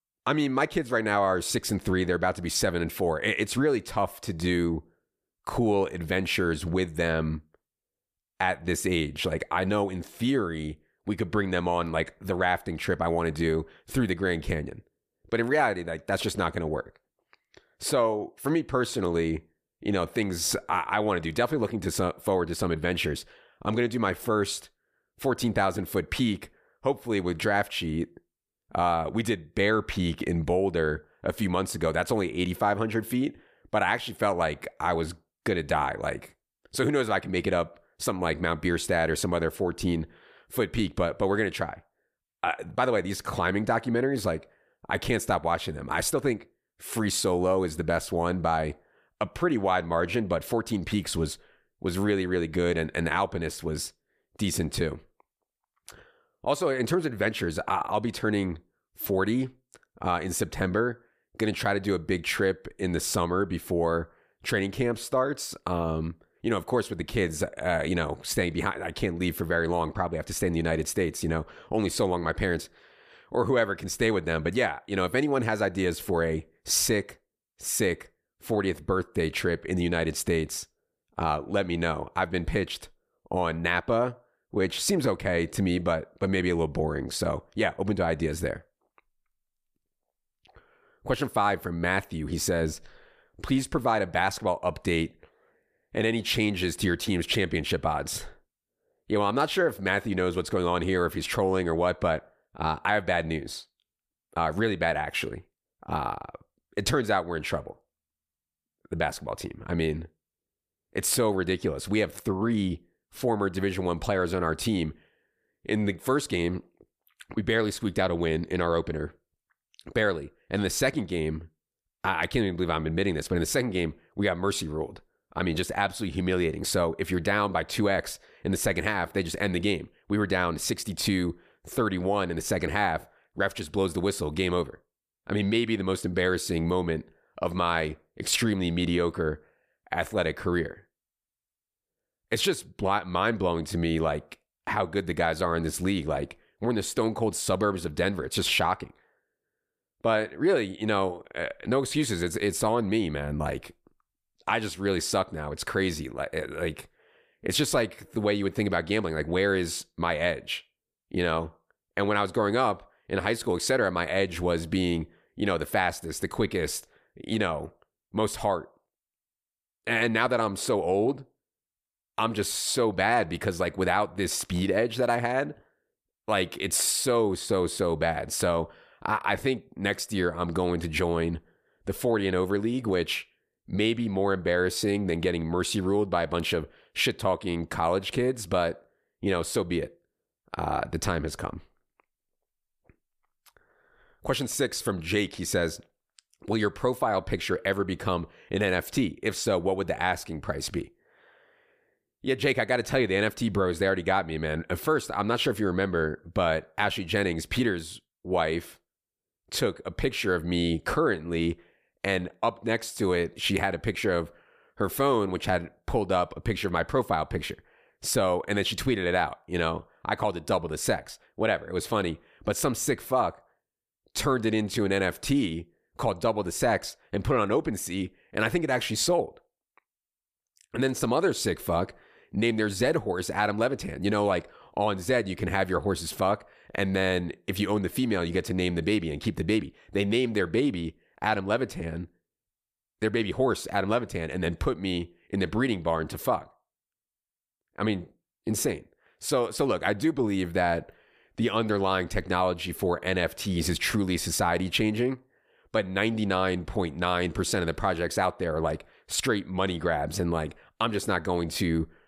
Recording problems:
none

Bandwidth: 14.5 kHz